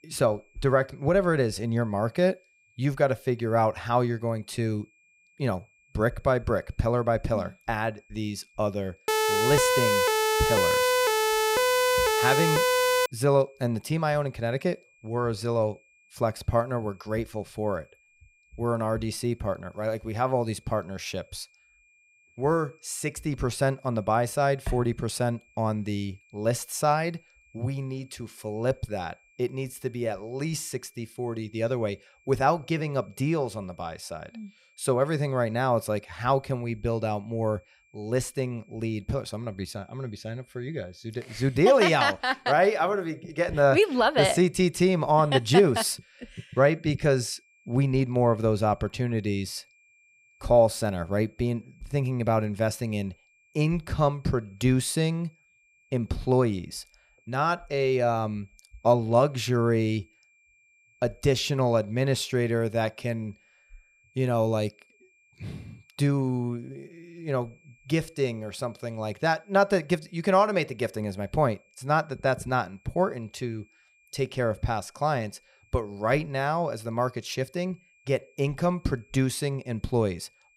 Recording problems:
high-pitched whine; faint; throughout; 2.5 kHz, 35 dB below the speech
siren; loud; from 9 to 13 s; peak 5 dB above the speech

